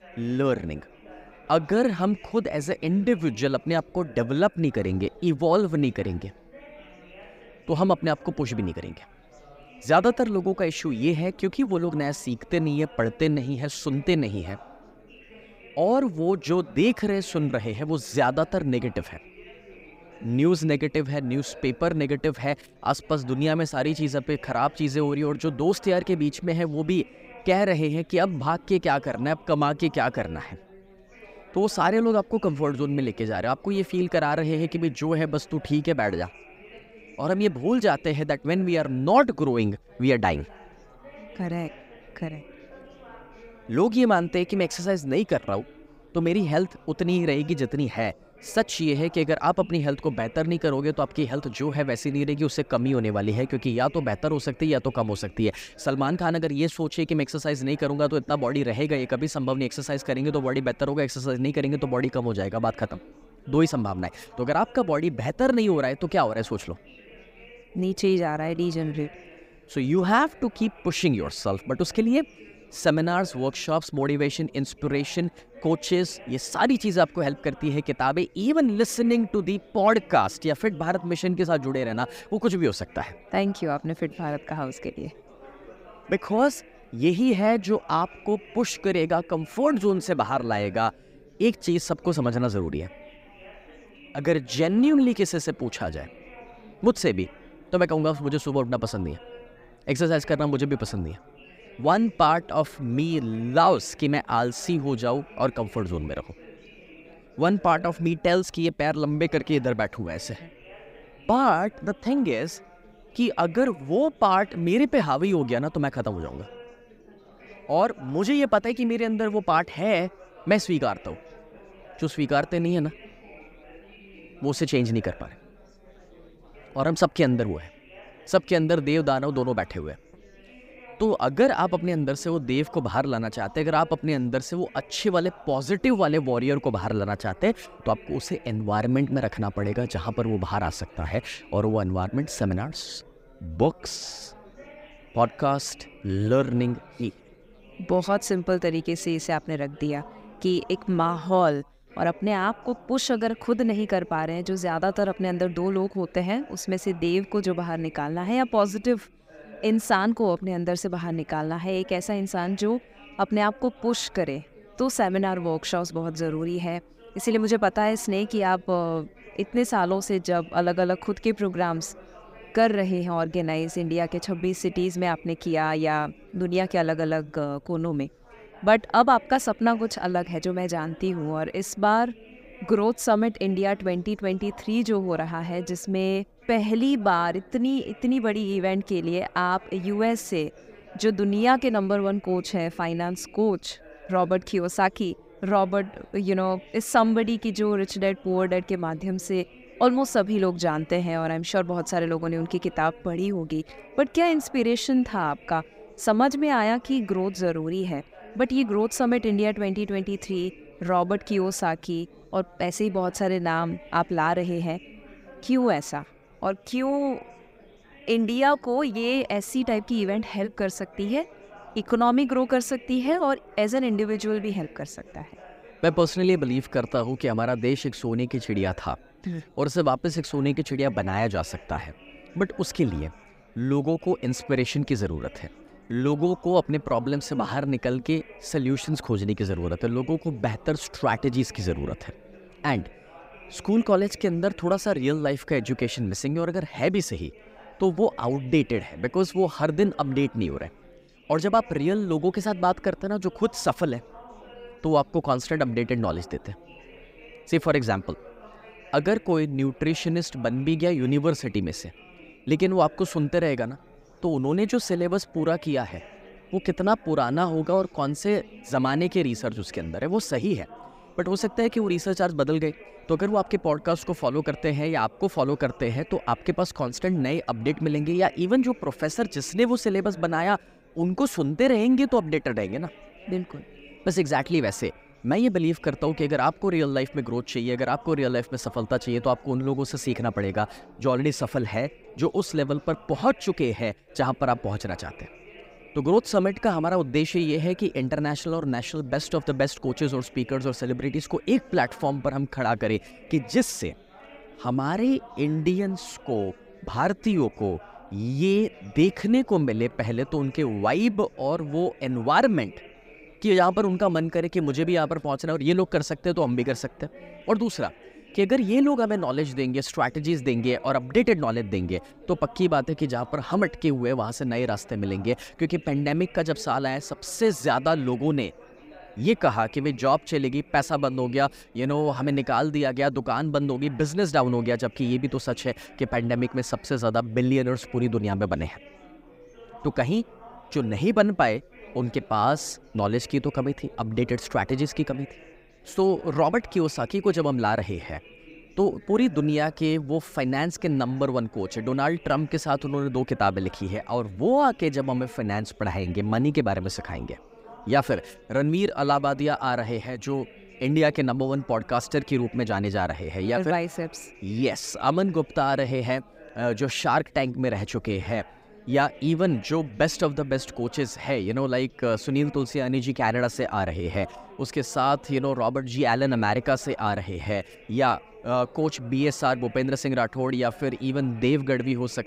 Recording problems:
chatter from many people; faint; throughout; 25 dB below the speech

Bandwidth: 15.5 kHz